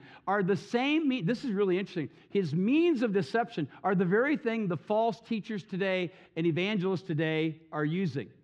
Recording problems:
muffled; very slightly; fading above 3.5 kHz

